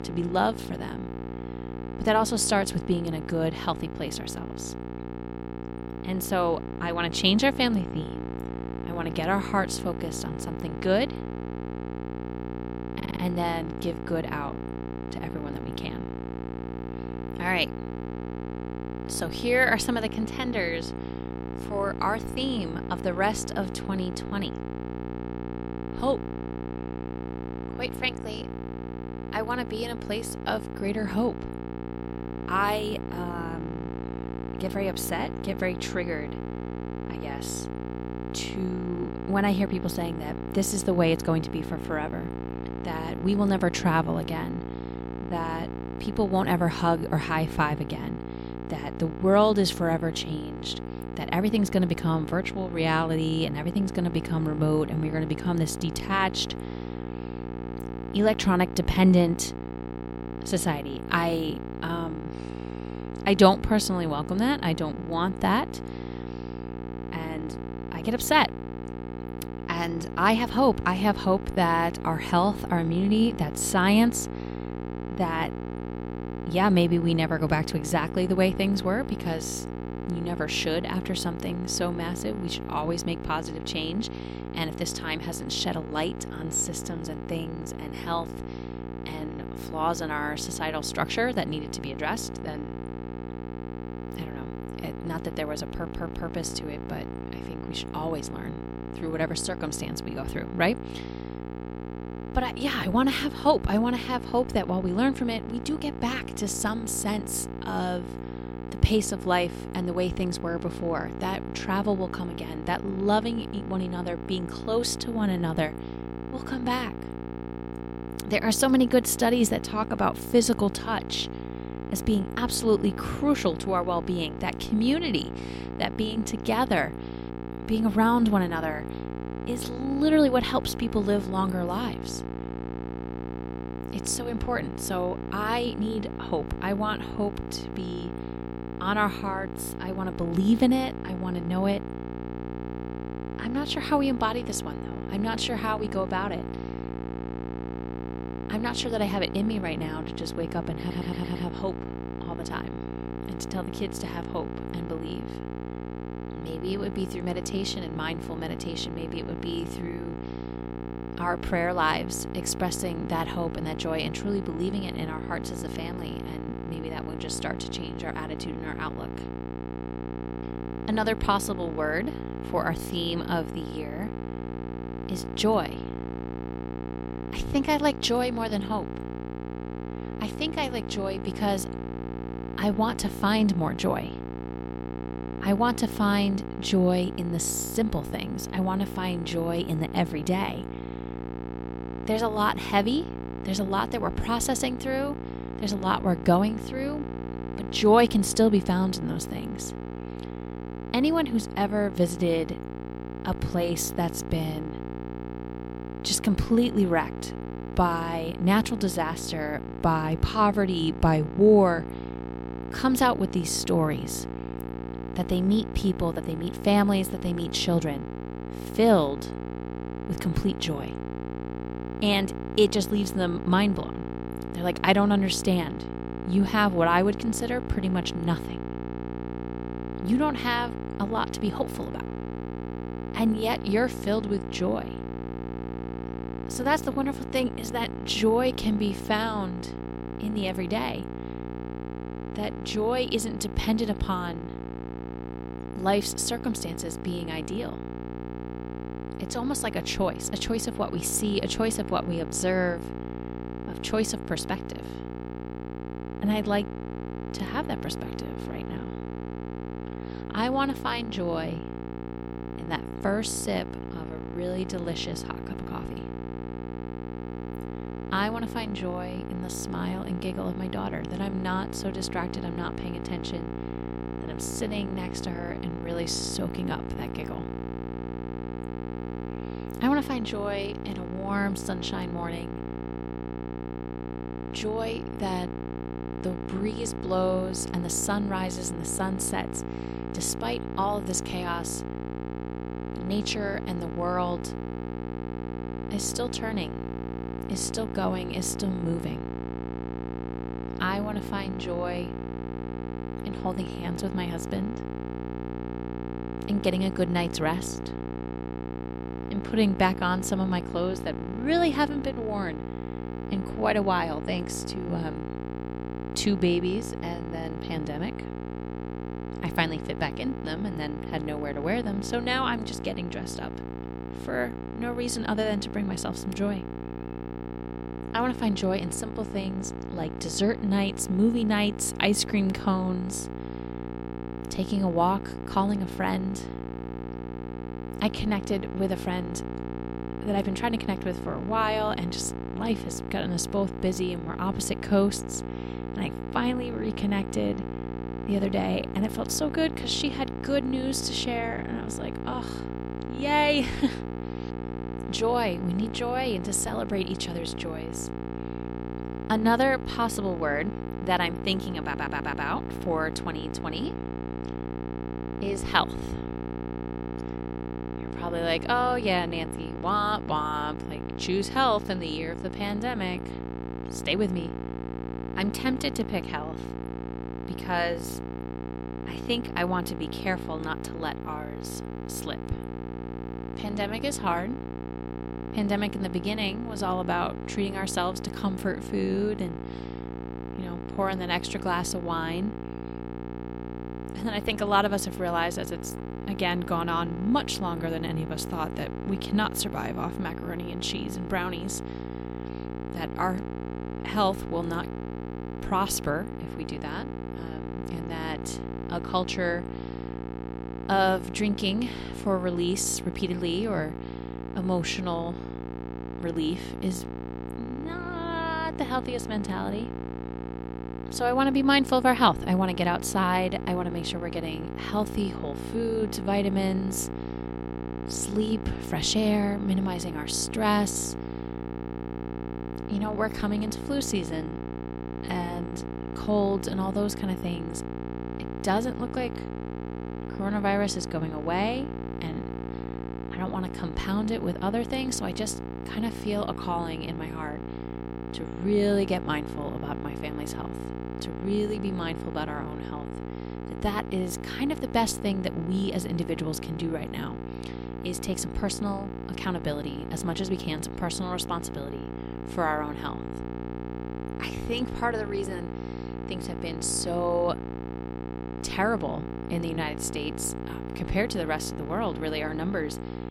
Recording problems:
electrical hum; noticeable; throughout; 60 Hz, 10 dB below the speech
audio stuttering; 4 times, first at 13 s

